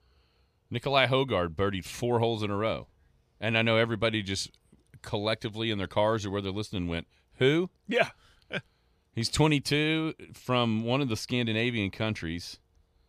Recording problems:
none

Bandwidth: 14.5 kHz